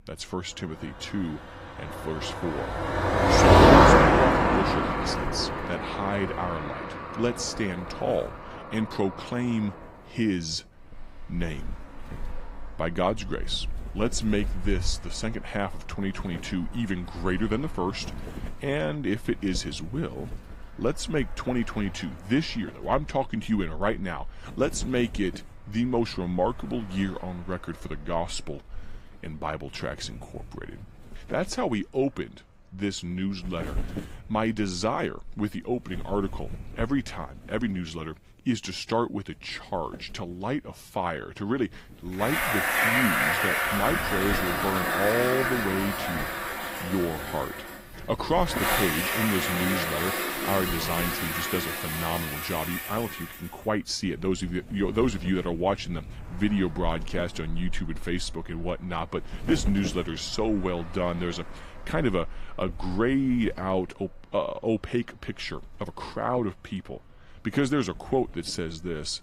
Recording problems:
garbled, watery; slightly; nothing above 15.5 kHz
traffic noise; very loud; throughout; 5 dB above the speech
wind noise on the microphone; occasional gusts; 20 dB below the speech

